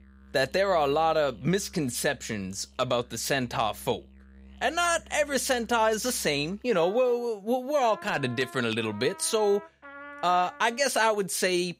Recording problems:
background music; faint; throughout; 20 dB below the speech

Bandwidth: 15.5 kHz